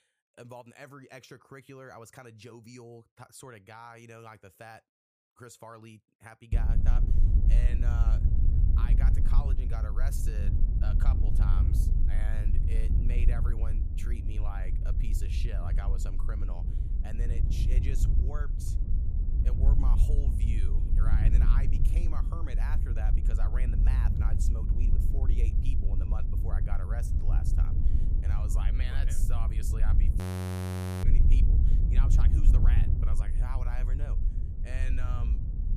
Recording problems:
wind noise on the microphone; heavy; from 6.5 s on; as loud as the speech
audio freezing; at 30 s for 1 s

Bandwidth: 15 kHz